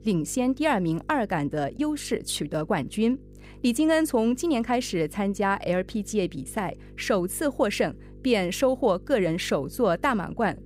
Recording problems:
electrical hum; faint; throughout; 50 Hz, 30 dB below the speech

